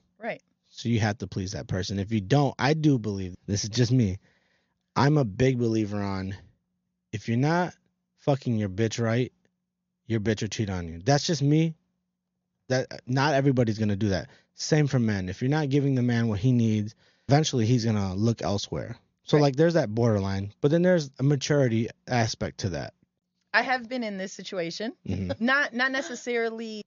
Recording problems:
high frequencies cut off; noticeable; nothing above 7 kHz

